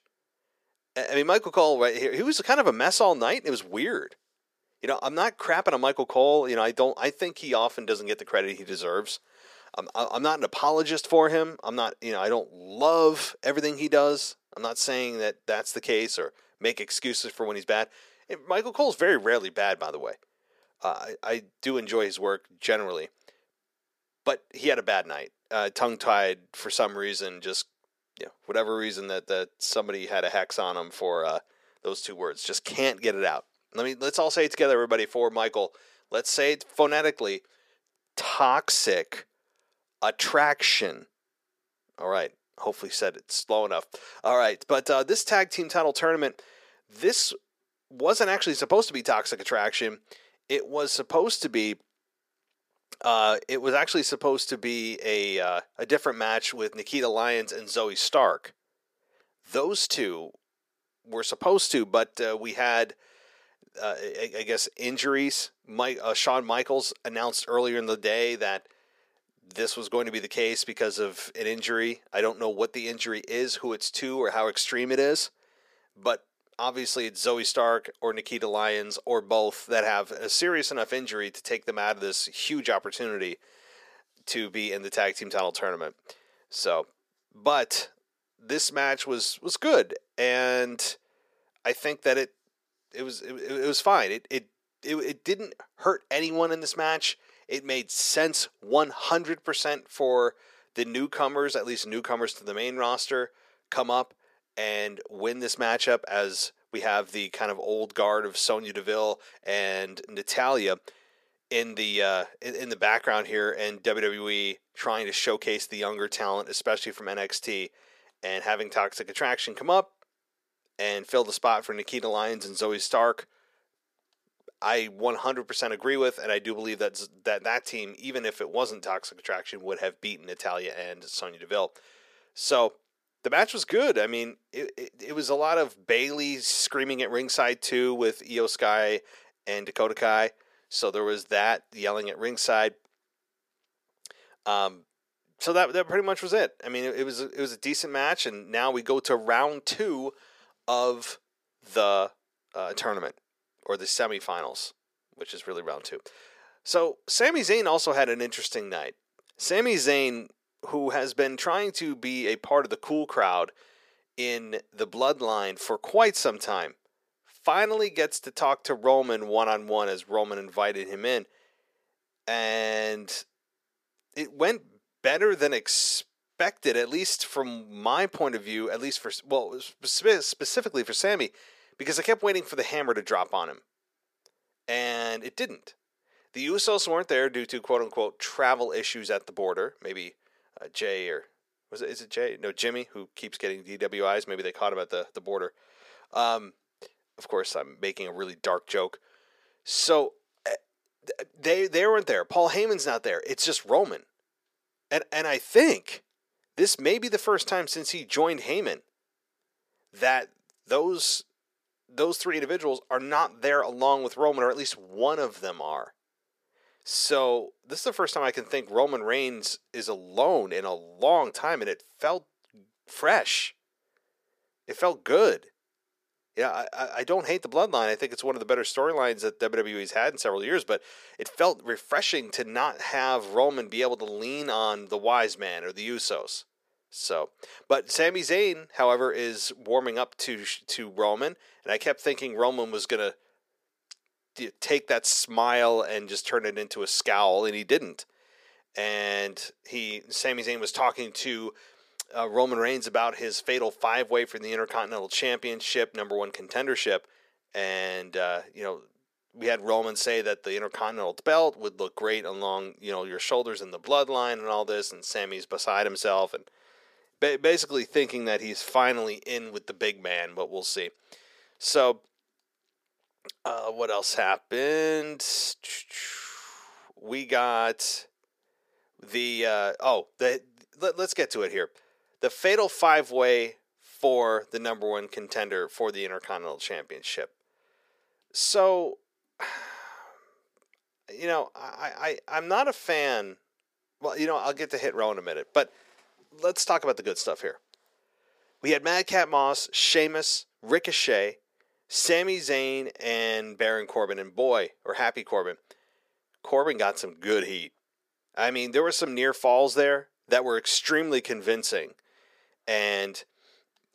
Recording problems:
thin; somewhat; fading below 350 Hz

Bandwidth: 15 kHz